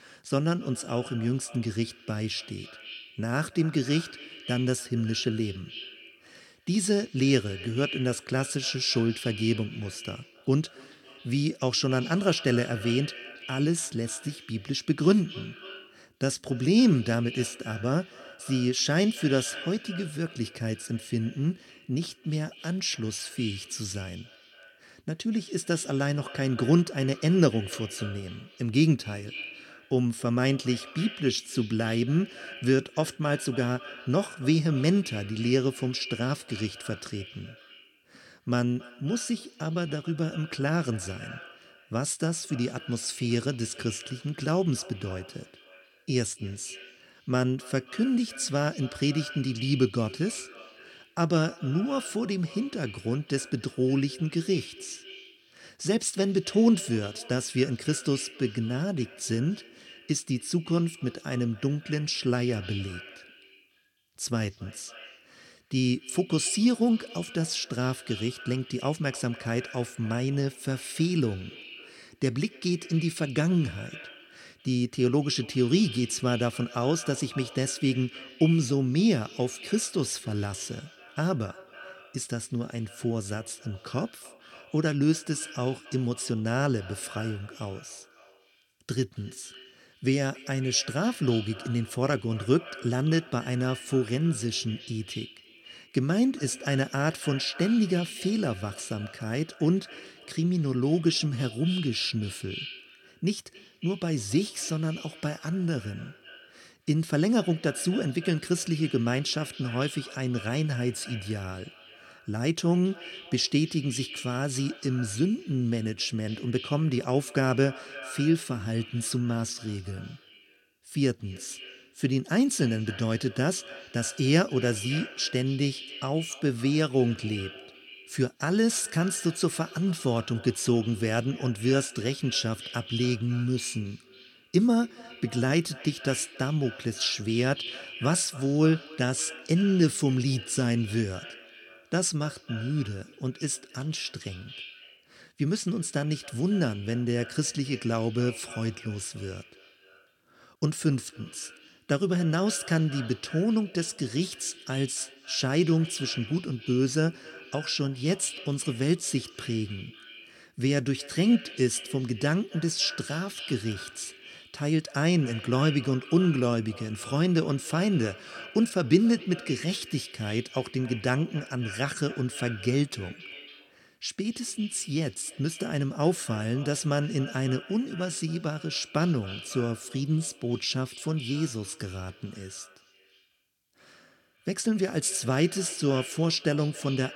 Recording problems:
echo of what is said; noticeable; throughout; 270 ms later, 15 dB below the speech

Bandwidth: 17.5 kHz